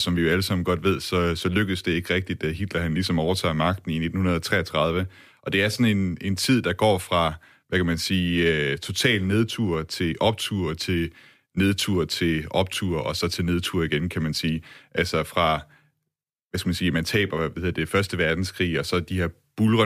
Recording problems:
abrupt cut into speech; at the start and the end

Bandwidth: 15 kHz